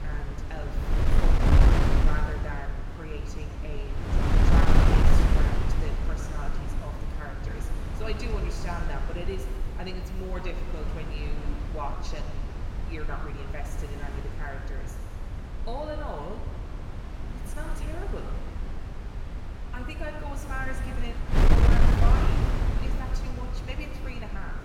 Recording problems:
room echo; noticeable; dies away in 1.7 s
off-mic speech; somewhat distant
wind noise on the microphone; heavy; 2 dB above the speech

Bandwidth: 16 kHz